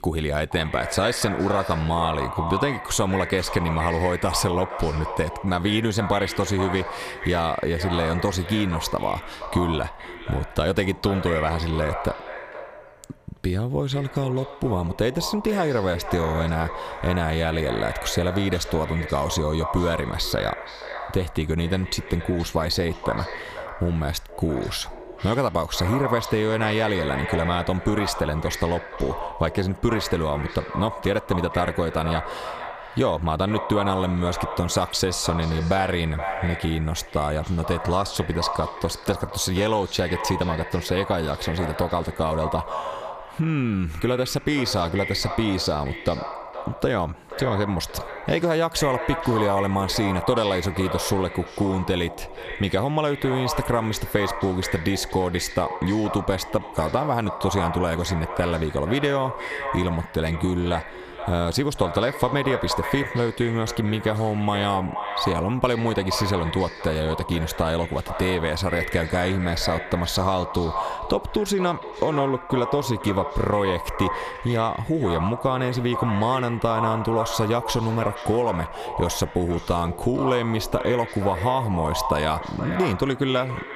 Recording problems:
echo of what is said; strong; throughout; 470 ms later, 8 dB below the speech
squashed, flat; somewhat

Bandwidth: 14.5 kHz